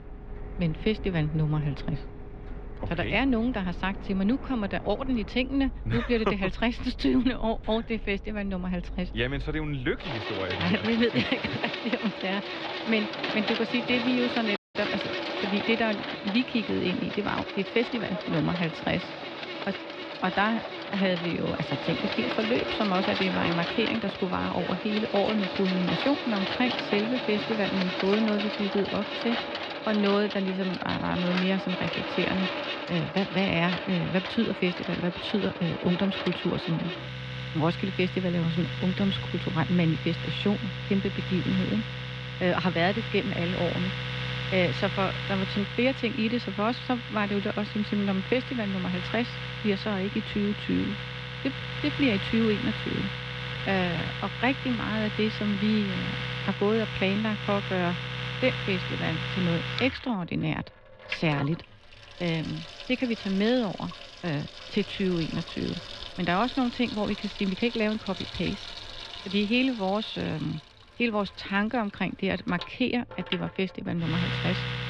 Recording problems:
muffled; slightly; fading above 3.5 kHz
household noises; loud; throughout; 5 dB below the speech
uneven, jittery; strongly; from 10 to 54 s
audio cutting out; at 15 s

